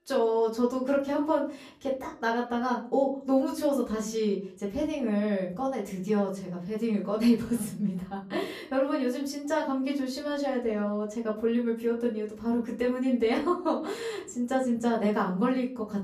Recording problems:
off-mic speech; far
room echo; very slight; dies away in 0.4 s

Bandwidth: 14.5 kHz